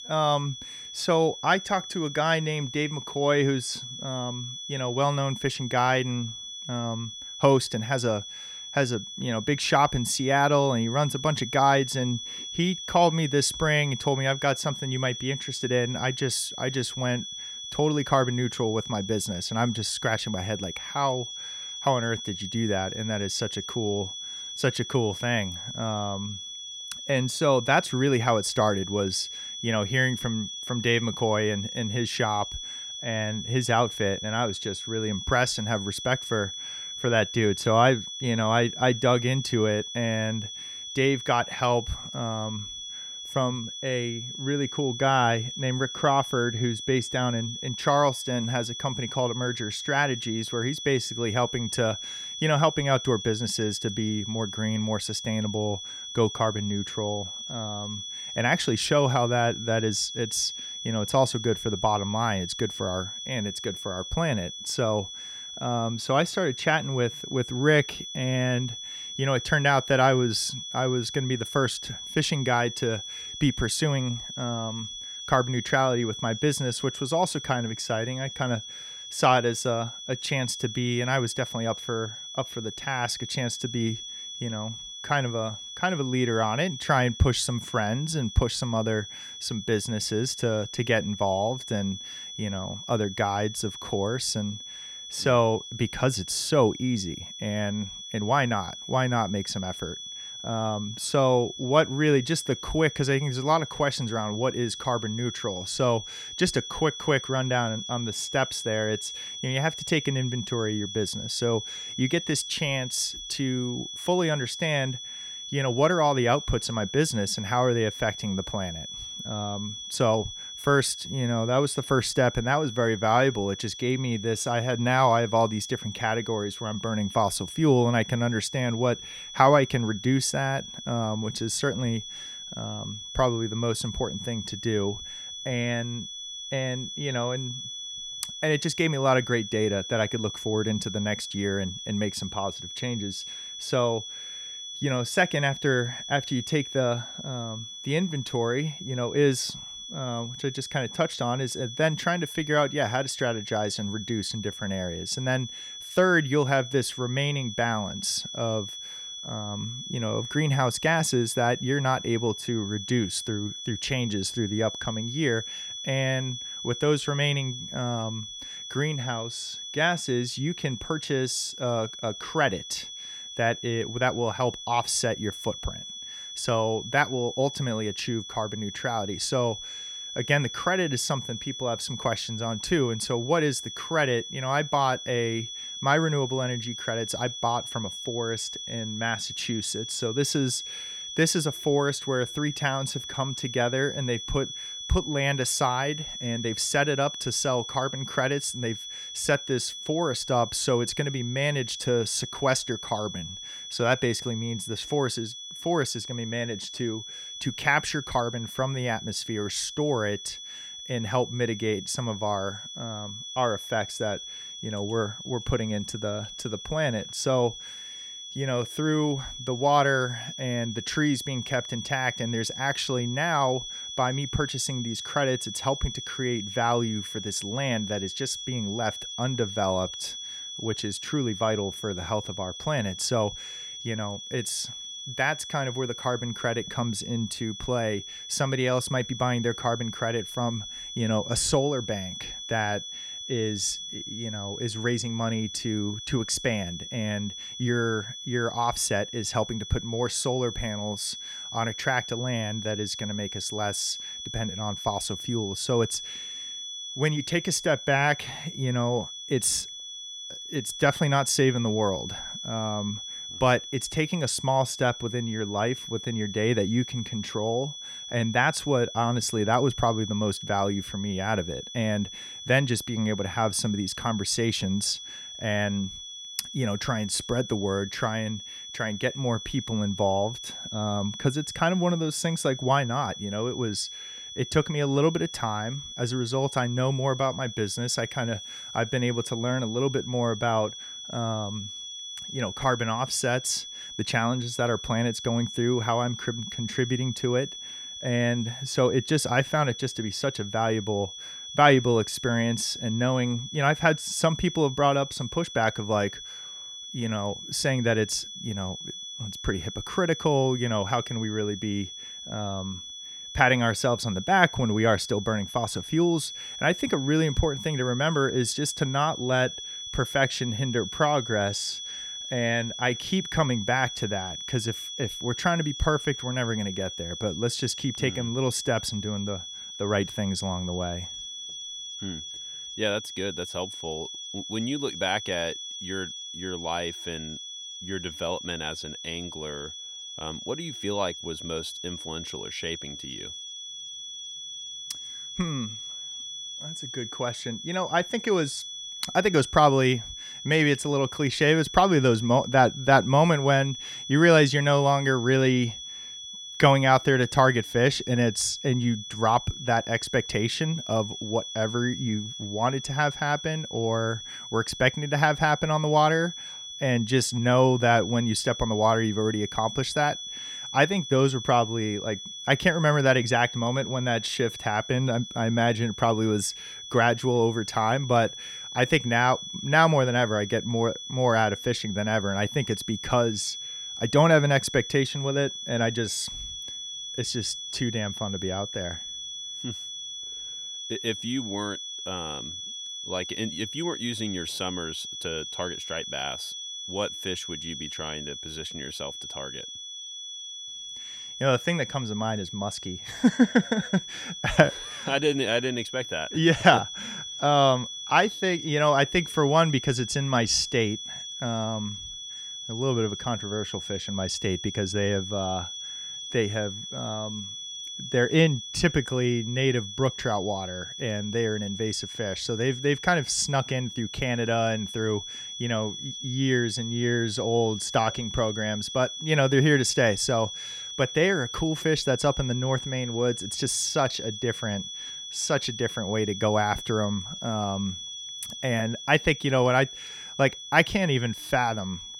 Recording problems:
high-pitched whine; loud; throughout; 3.5 kHz, 9 dB below the speech

